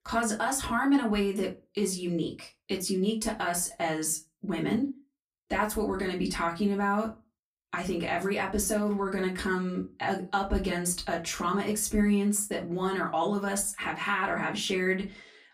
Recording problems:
off-mic speech; far
room echo; very slight; dies away in 0.2 s

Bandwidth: 15 kHz